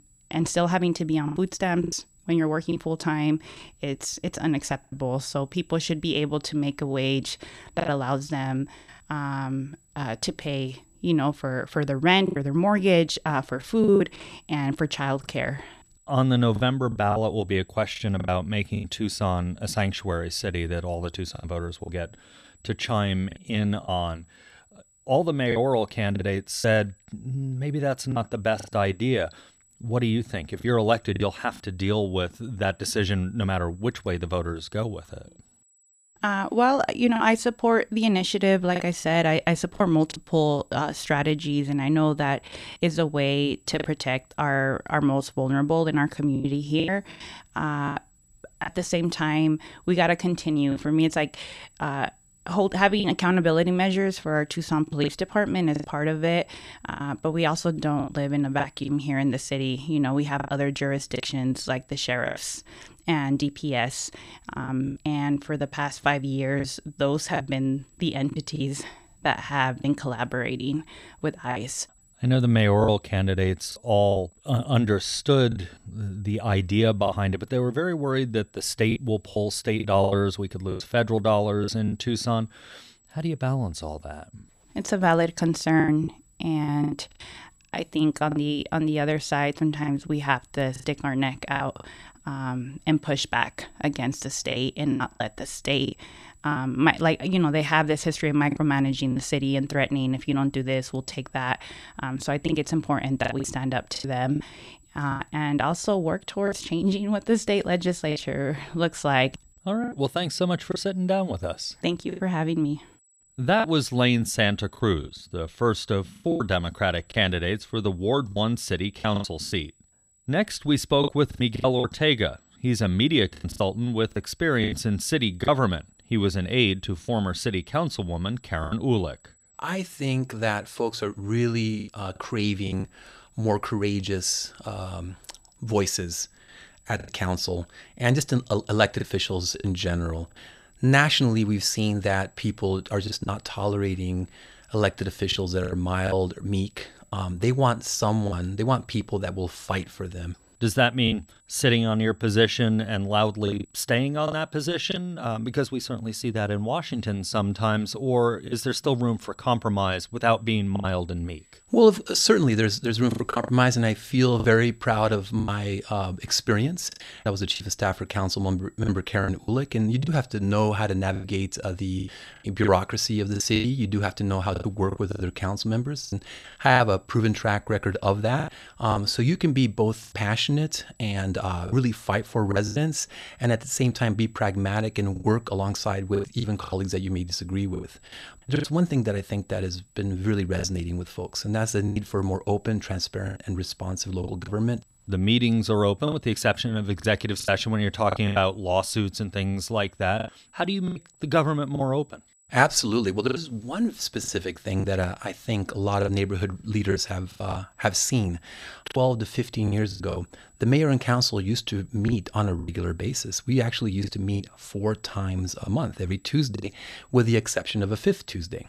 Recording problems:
high-pitched whine; faint; throughout; 8 kHz, 35 dB below the speech
choppy; very; 6% of the speech affected

